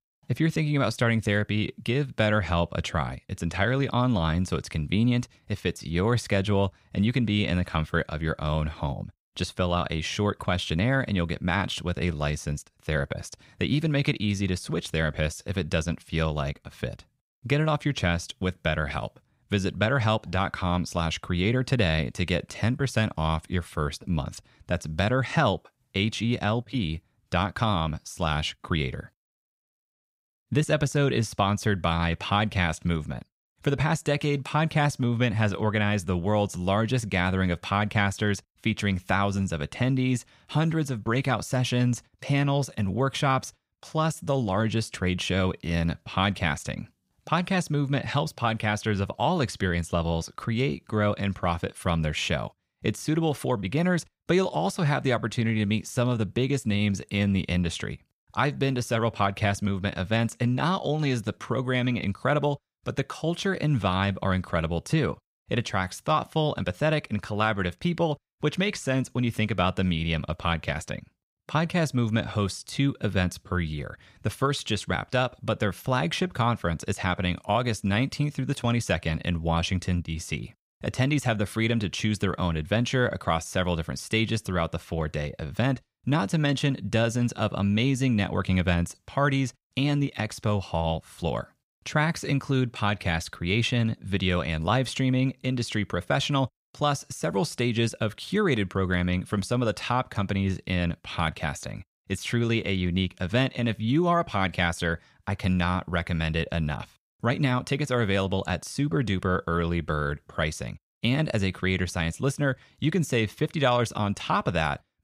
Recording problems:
none

